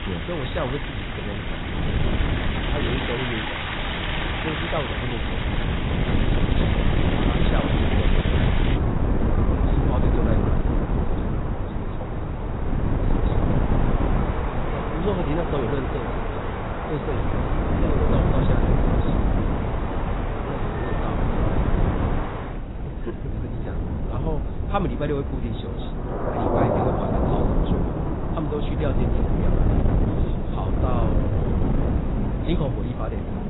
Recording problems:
garbled, watery; badly; nothing above 4 kHz
rain or running water; very loud; throughout; 1 dB above the speech
wind noise on the microphone; heavy; as loud as the speech

